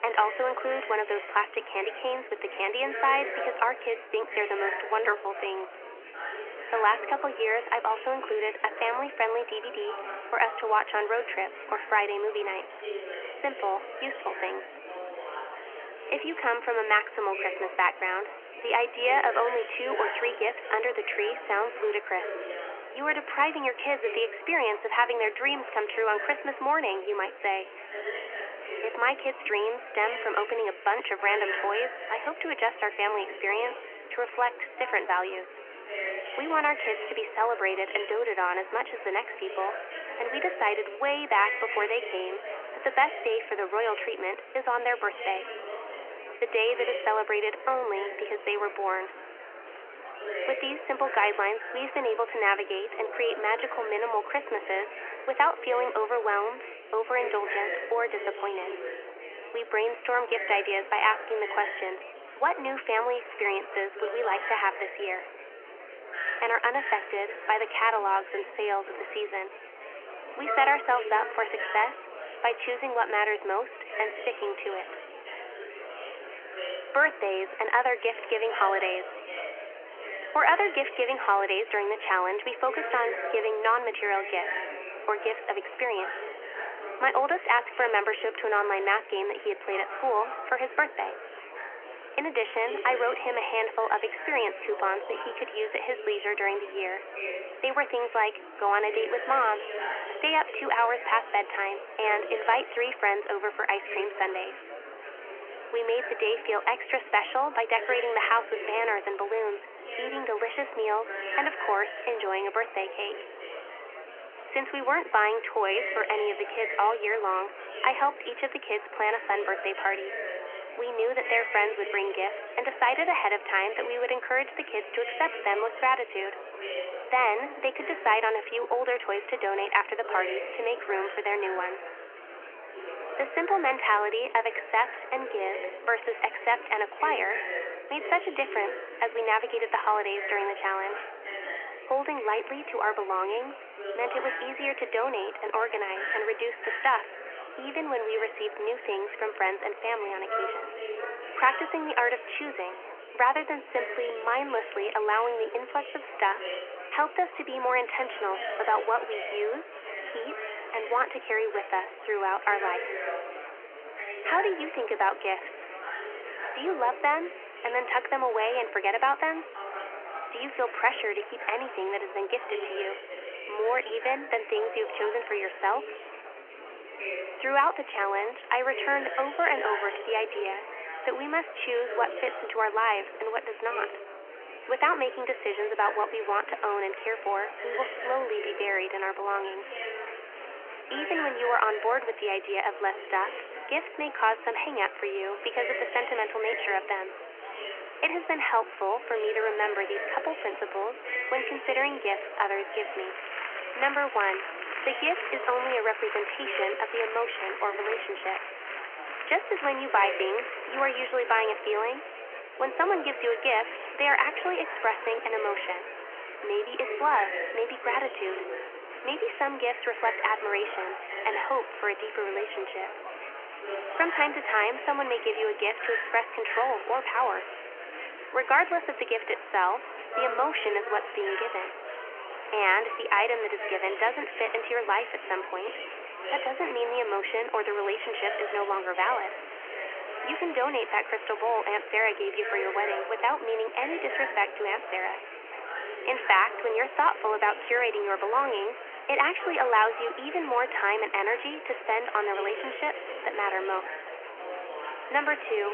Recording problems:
thin; very; fading below 250 Hz
phone-call audio
murmuring crowd; loud; throughout; 9 dB below the speech
abrupt cut into speech; at the end

